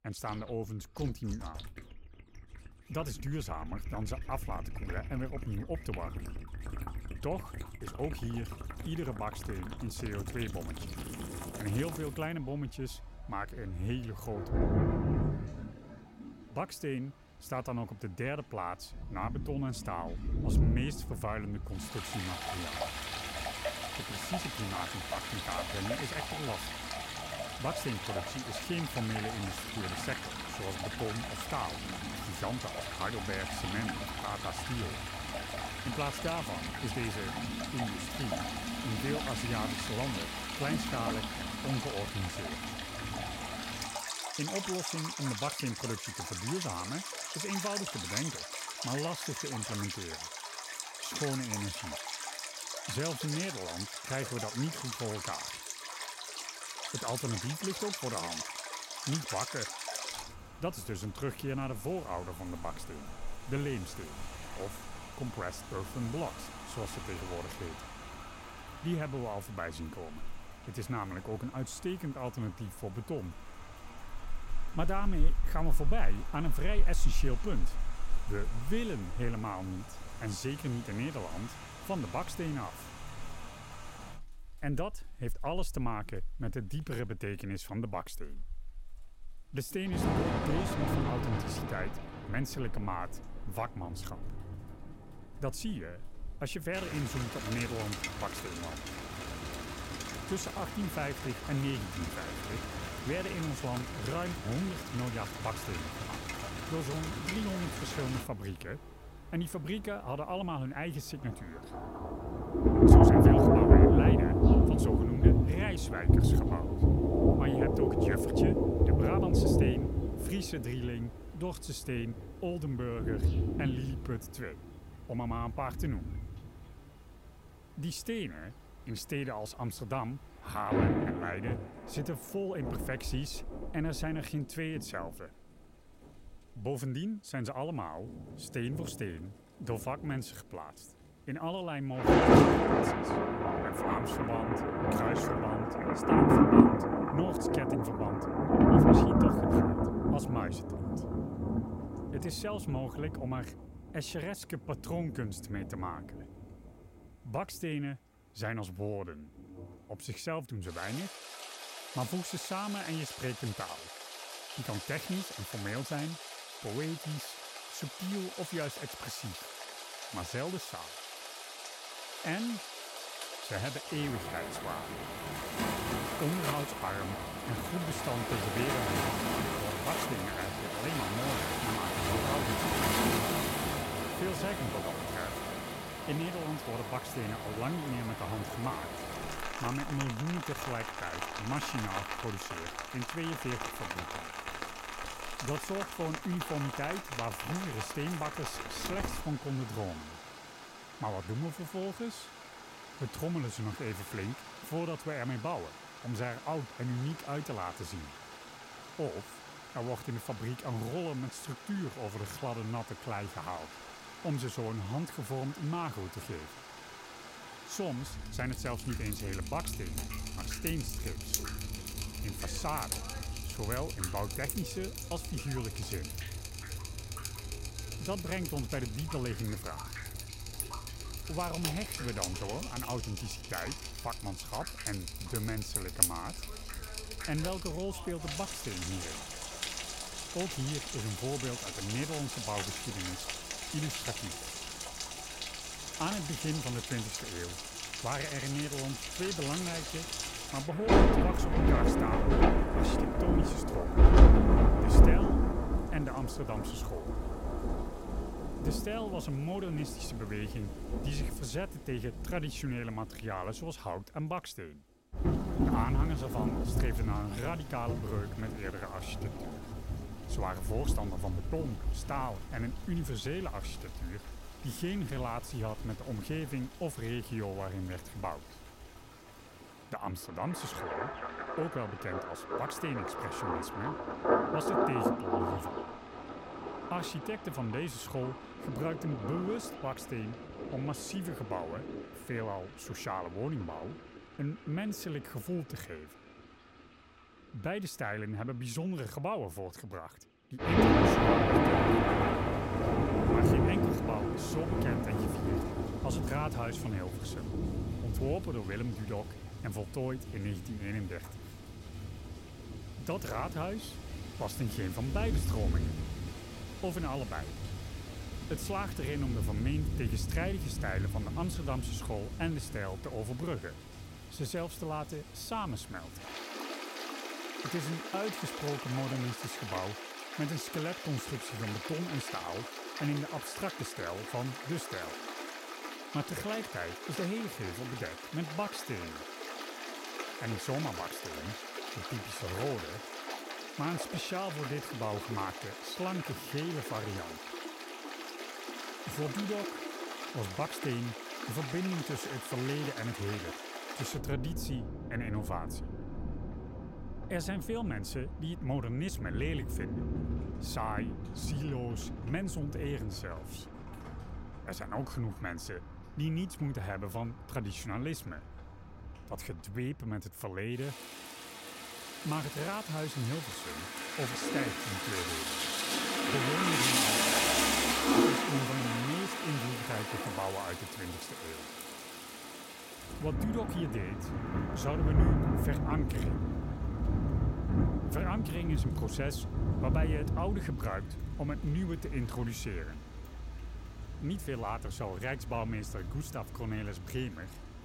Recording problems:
rain or running water; very loud; throughout; 4 dB above the speech

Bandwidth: 16 kHz